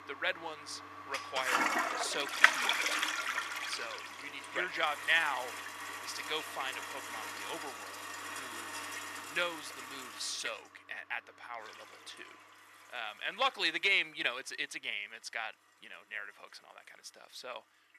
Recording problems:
thin; very; fading below 700 Hz
household noises; very loud; throughout; 1 dB above the speech

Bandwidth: 14.5 kHz